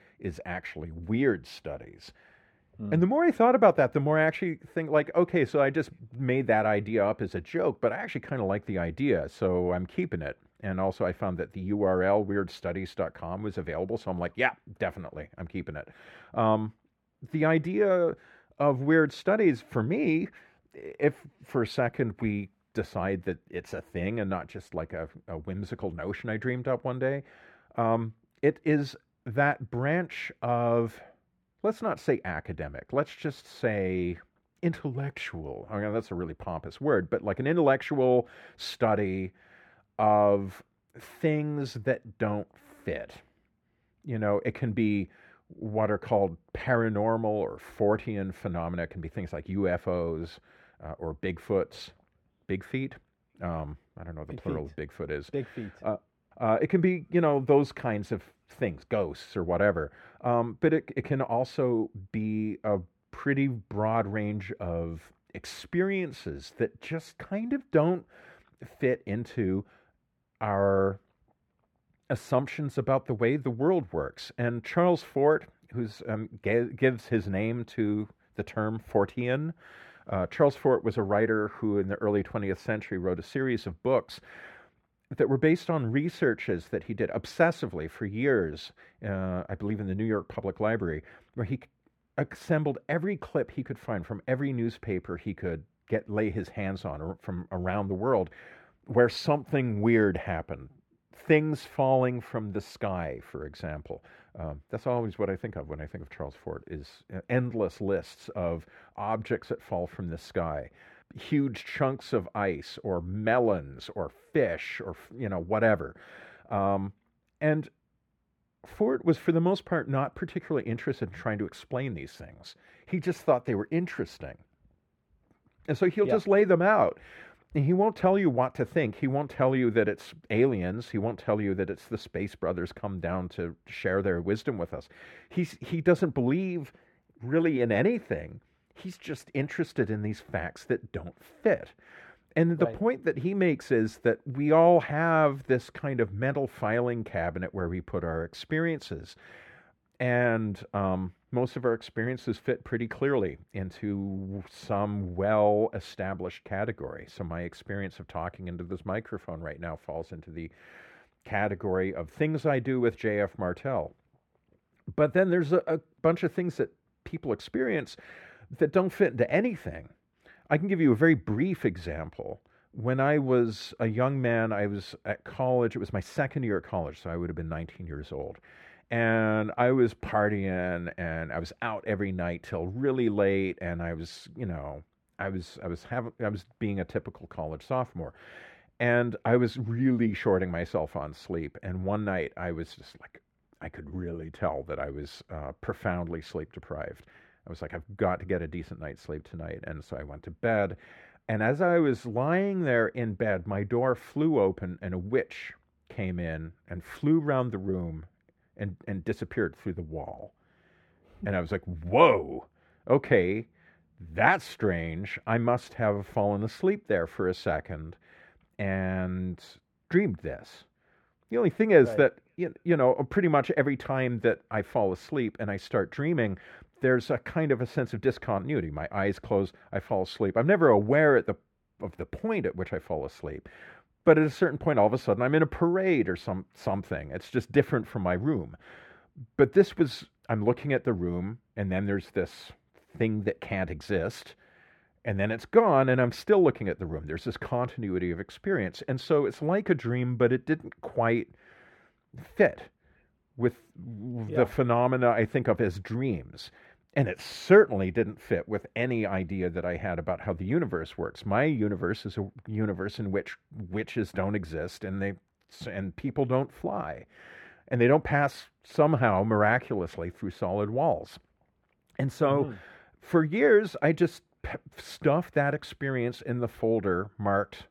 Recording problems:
muffled; slightly; fading above 3.5 kHz

